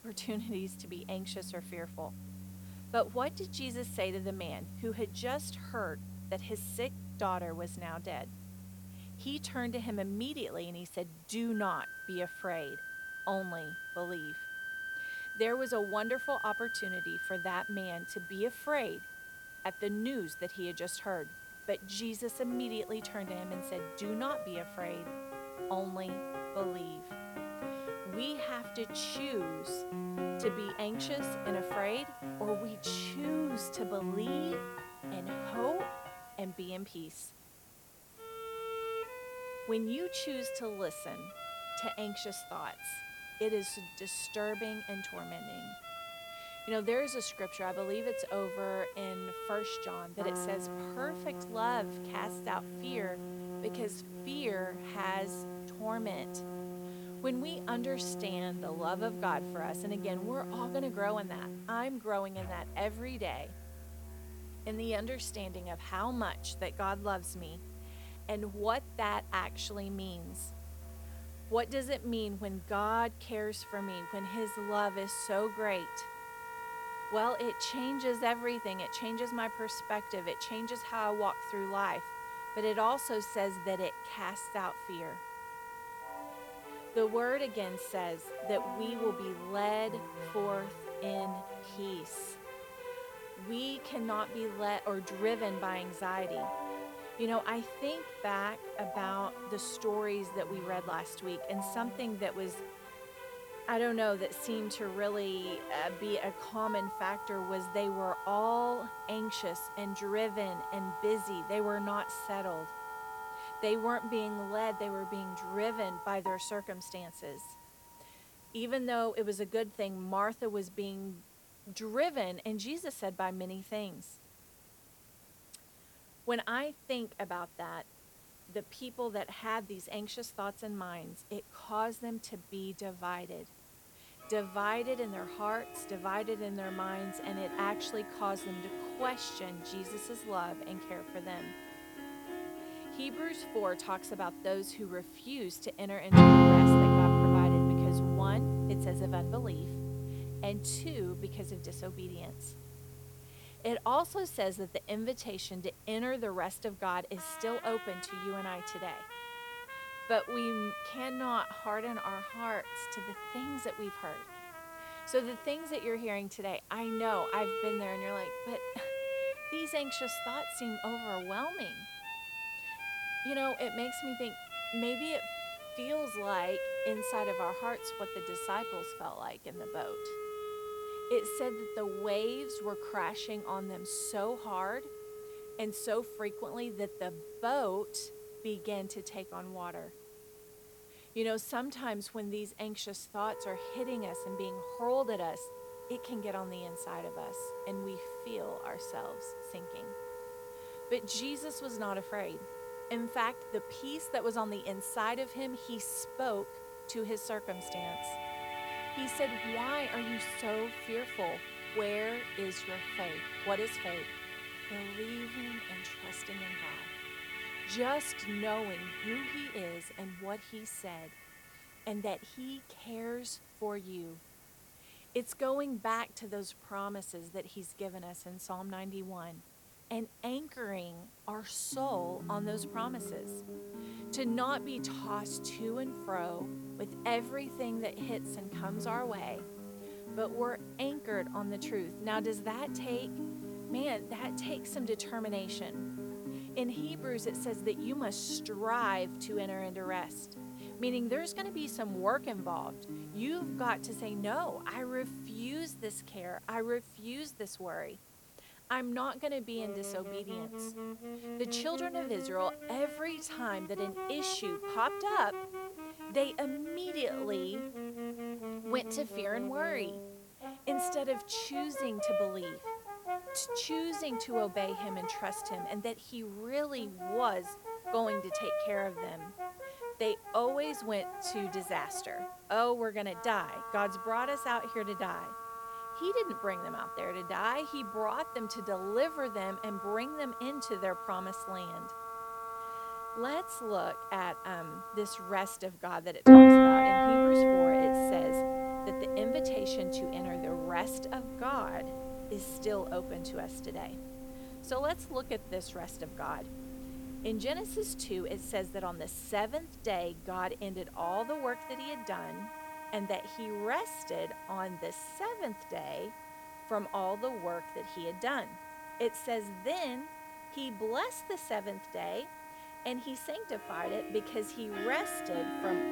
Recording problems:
background music; very loud; throughout; 3 dB above the speech
hiss; noticeable; throughout; 20 dB below the speech

